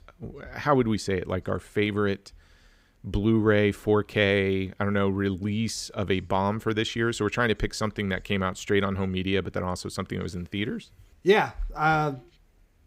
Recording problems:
none

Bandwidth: 15.5 kHz